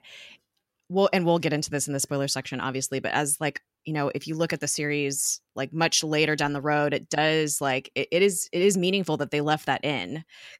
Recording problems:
none

